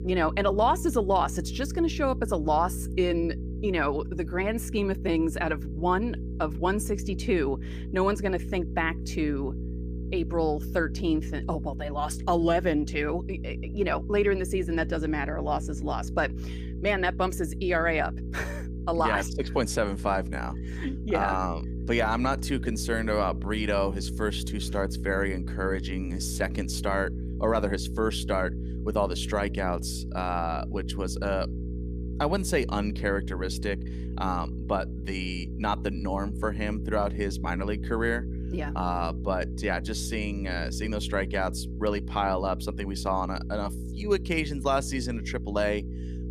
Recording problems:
electrical hum; noticeable; throughout; 60 Hz, 15 dB below the speech

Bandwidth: 15 kHz